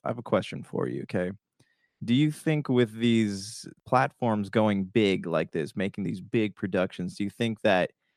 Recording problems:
none

